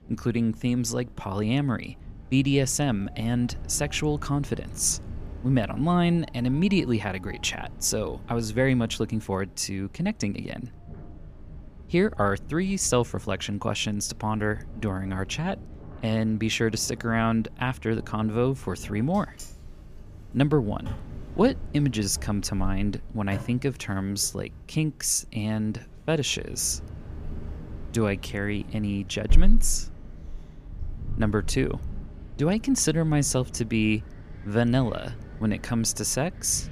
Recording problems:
wind in the background; noticeable; throughout; 15 dB below the speech

